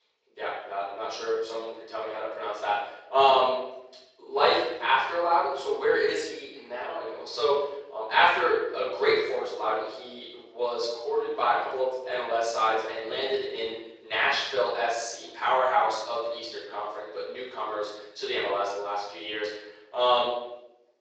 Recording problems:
off-mic speech; far
thin; very; fading below 400 Hz
room echo; noticeable; dies away in 0.8 s
garbled, watery; slightly; nothing above 7.5 kHz

